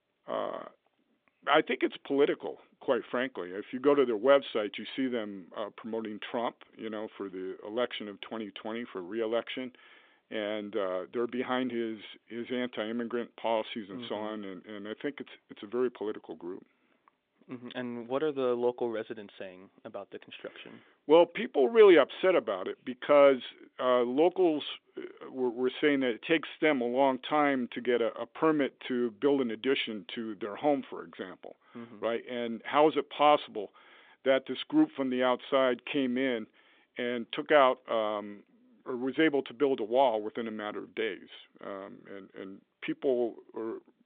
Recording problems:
phone-call audio

